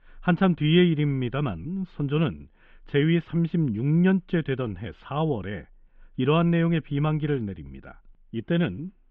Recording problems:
muffled; very slightly; fading above 3 kHz

